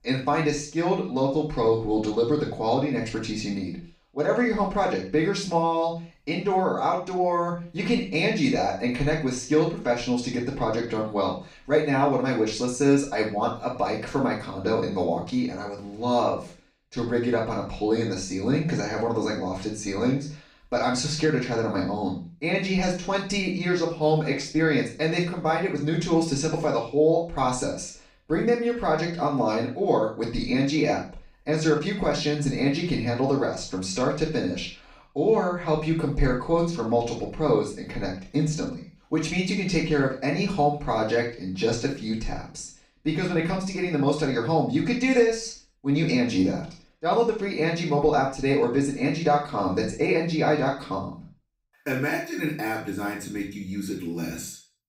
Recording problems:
off-mic speech; far
room echo; noticeable; dies away in 0.4 s

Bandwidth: 15.5 kHz